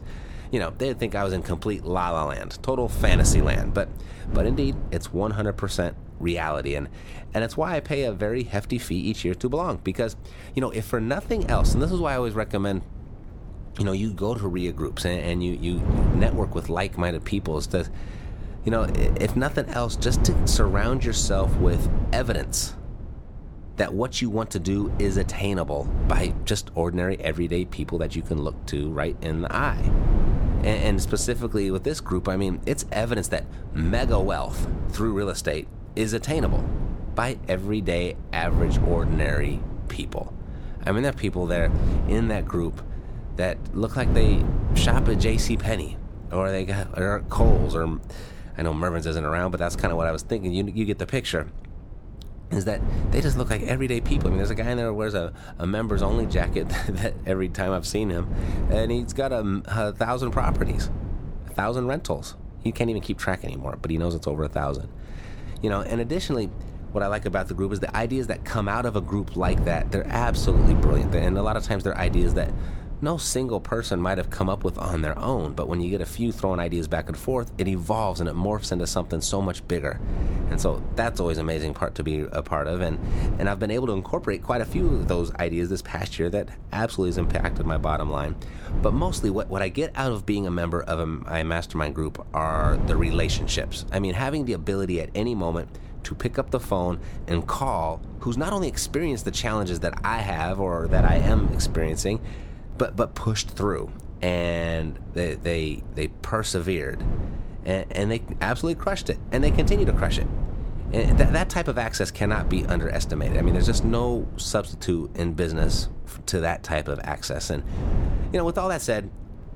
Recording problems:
wind noise on the microphone; occasional gusts; 10 dB below the speech

